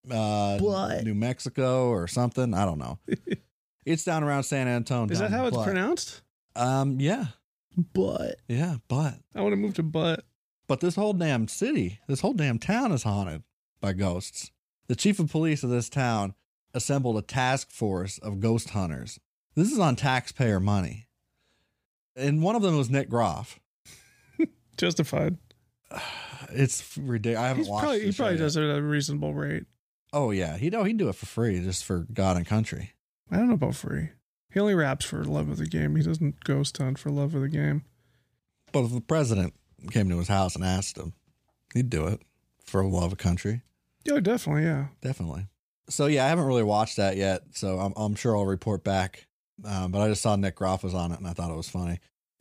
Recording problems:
none

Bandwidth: 15 kHz